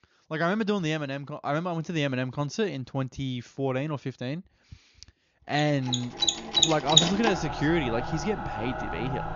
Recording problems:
high frequencies cut off; noticeable; nothing above 7 kHz
machinery noise; very loud; from 6.5 s on; 3 dB above the speech

